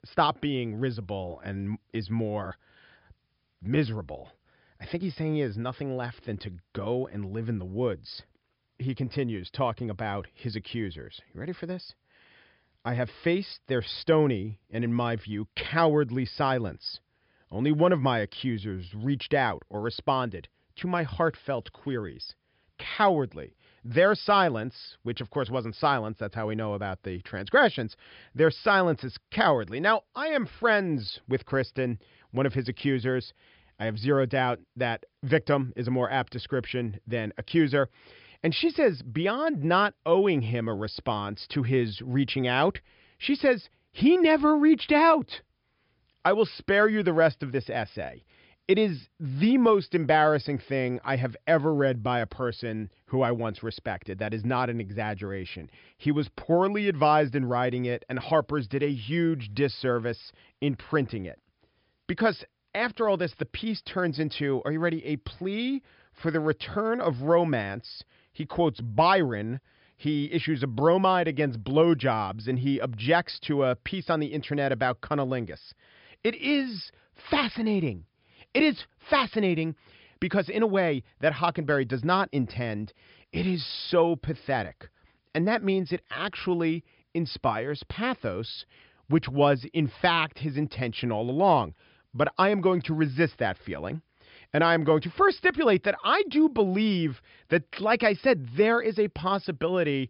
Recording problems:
high frequencies cut off; noticeable; nothing above 5.5 kHz

